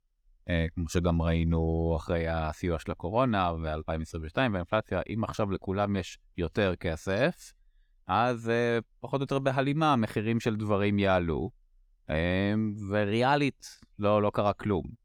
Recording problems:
none

